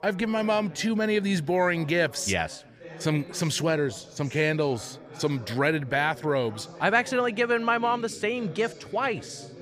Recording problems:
background chatter; noticeable; throughout; 3 voices, 20 dB below the speech

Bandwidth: 15 kHz